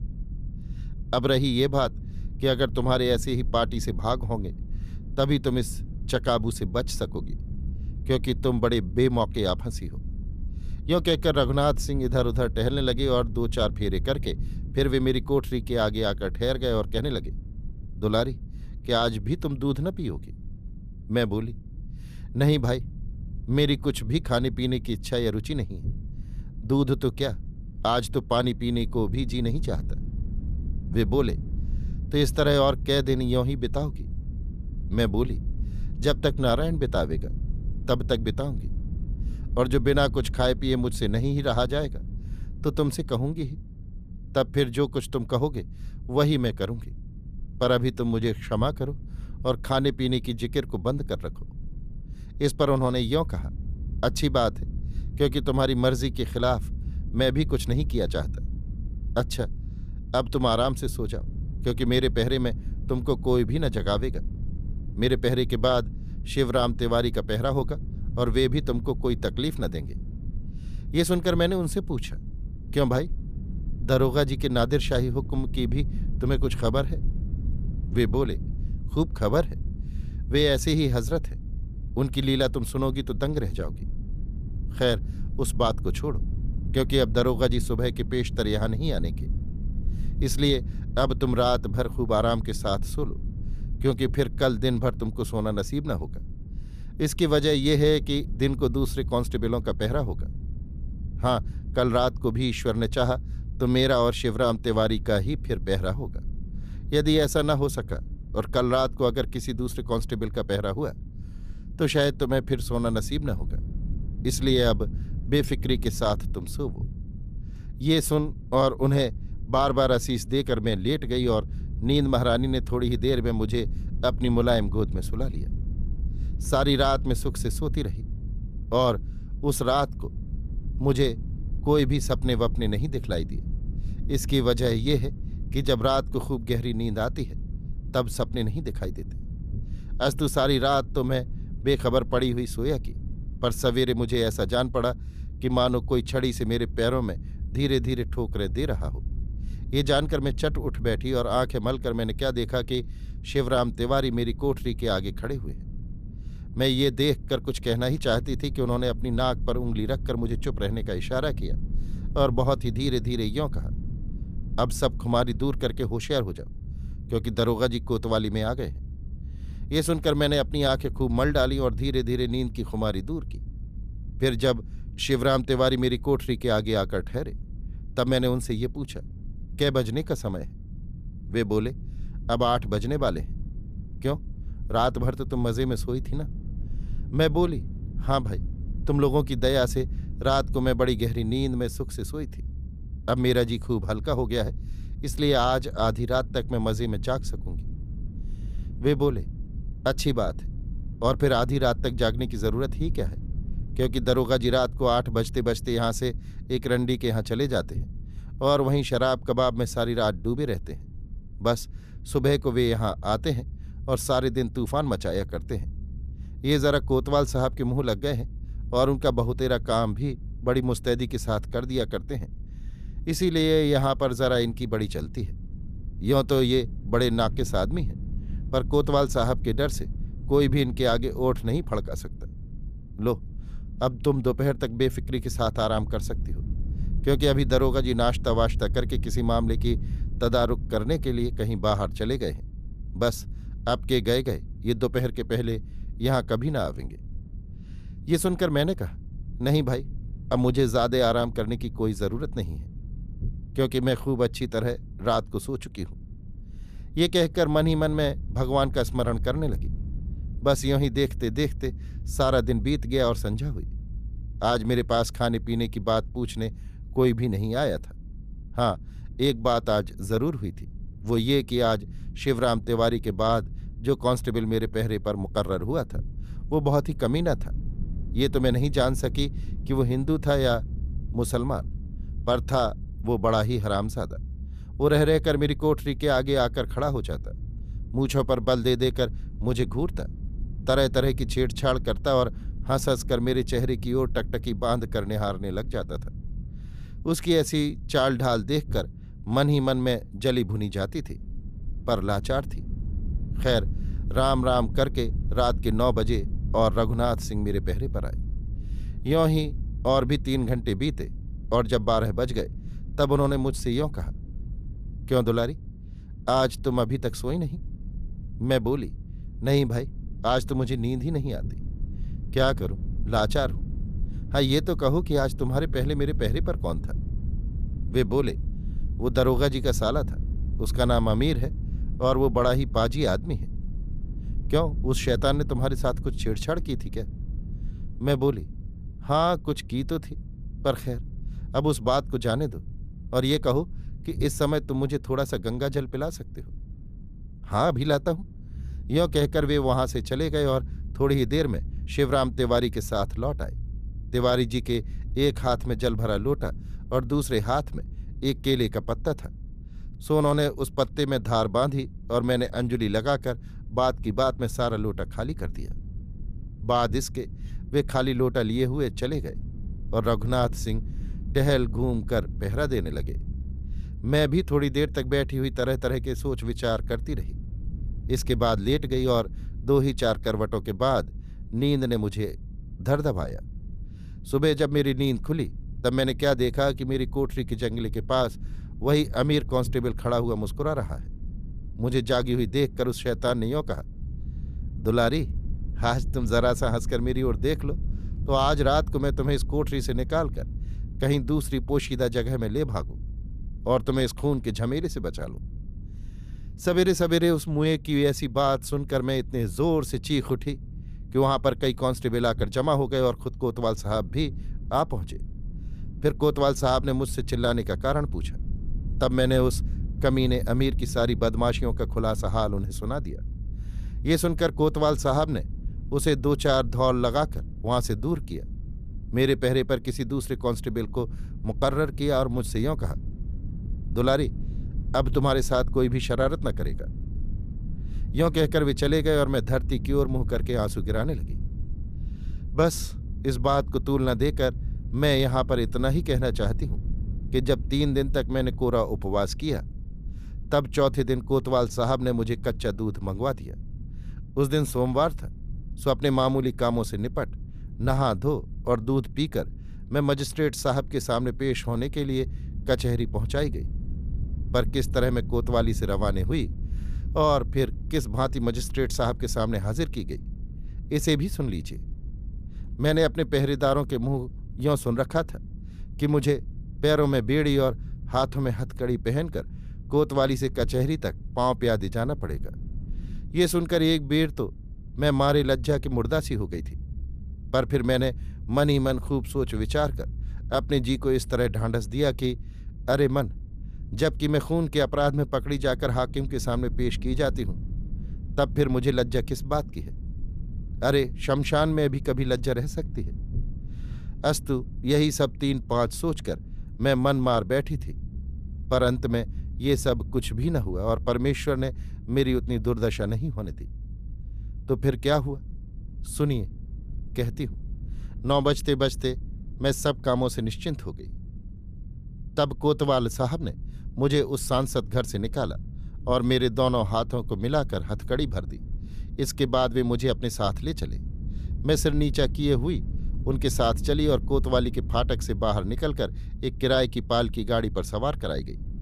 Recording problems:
low rumble; faint; throughout; 25 dB below the speech

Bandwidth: 14.5 kHz